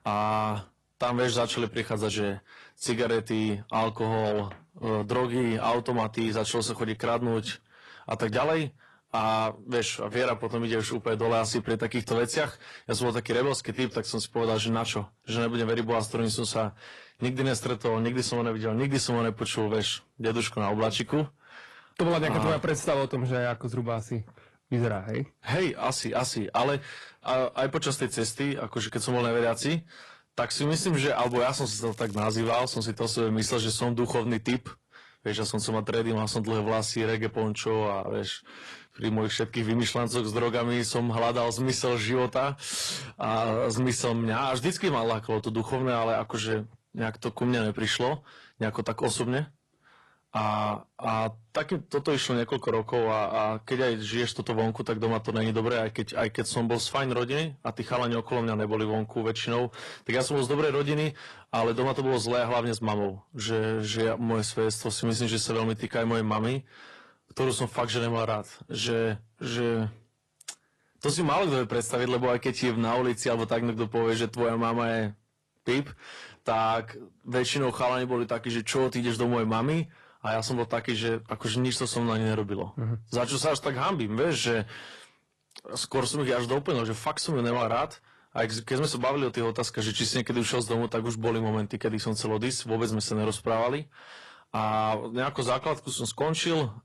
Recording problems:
distortion; slight; 10 dB below the speech
garbled, watery; slightly
crackling; faint; from 31 to 33 s; 20 dB below the speech

